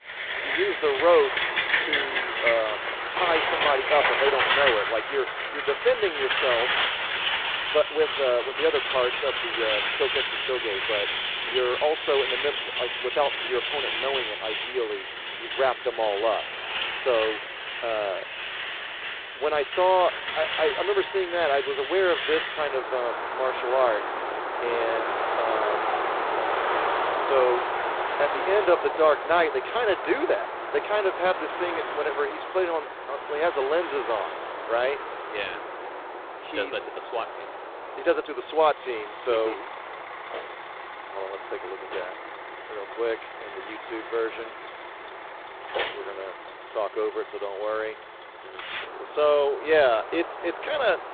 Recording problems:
phone-call audio; poor line; nothing above 4 kHz
echo of what is said; faint; throughout; 310 ms later, 20 dB below the speech
traffic noise; loud; throughout; 2 dB below the speech

